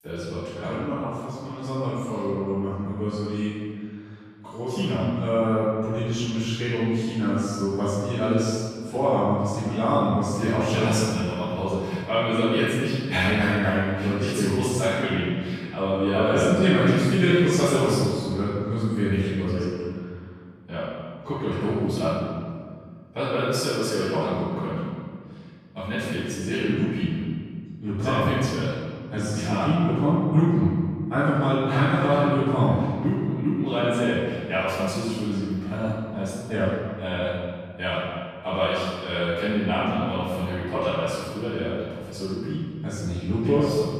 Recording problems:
room echo; strong; dies away in 1.8 s
off-mic speech; far

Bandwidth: 14.5 kHz